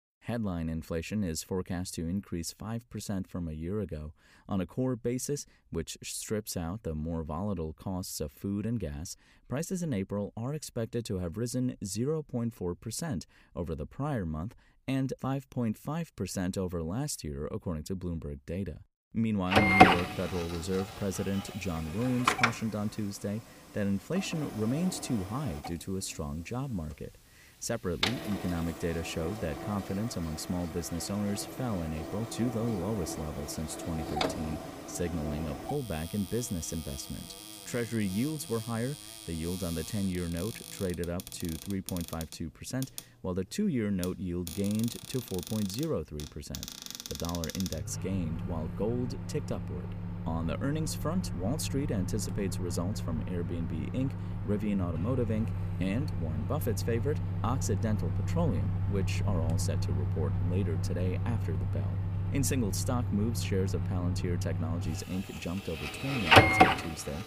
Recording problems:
household noises; very loud; from 20 s on; 1 dB above the speech

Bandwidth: 15 kHz